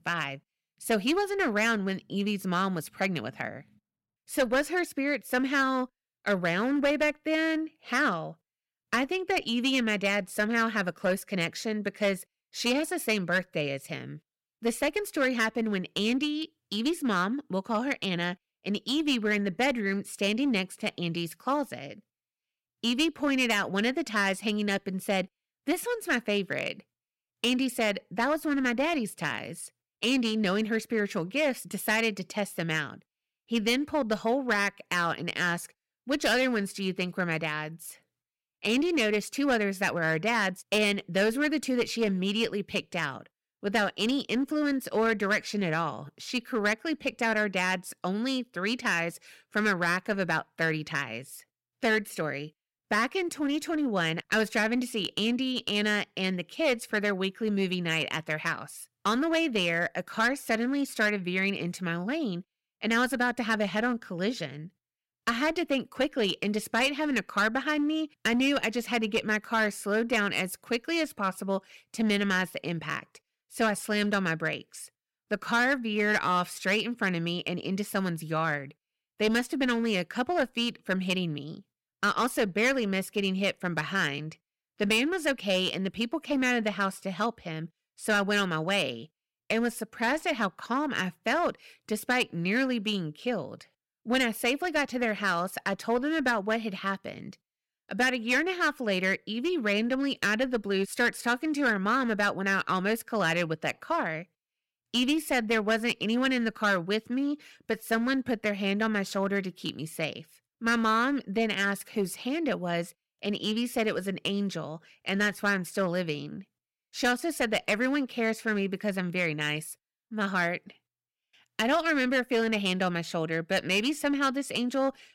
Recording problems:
distortion; slight; 5% of the sound clipped

